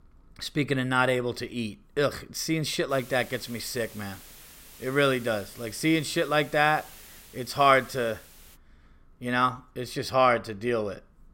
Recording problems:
hiss; faint; from 3 to 8.5 s; 20 dB below the speech

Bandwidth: 16 kHz